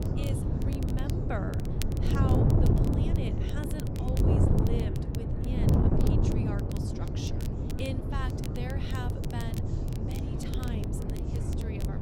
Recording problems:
wind noise on the microphone; heavy; 4 dB above the speech
crackle, like an old record; loud; 8 dB below the speech
background chatter; noticeable; throughout; 4 voices, 15 dB below the speech

